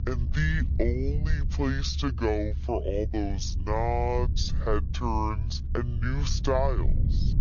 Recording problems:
wrong speed and pitch; too slow and too low; 0.6 times normal speed
high frequencies cut off; noticeable; nothing above 6.5 kHz
low rumble; noticeable; throughout; 15 dB below the speech

